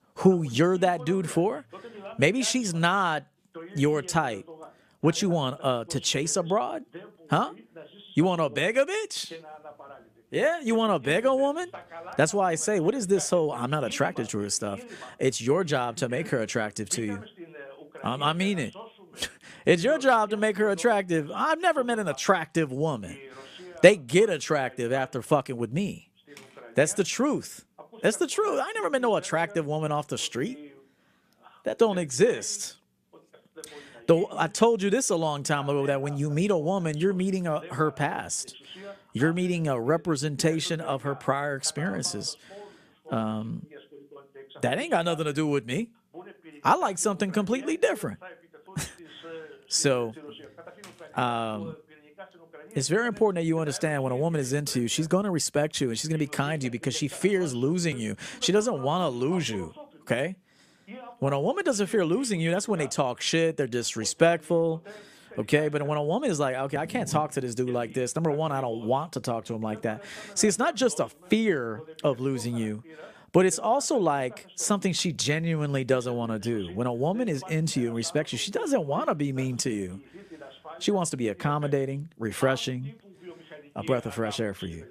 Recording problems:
voice in the background; faint; throughout; 20 dB below the speech

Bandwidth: 14.5 kHz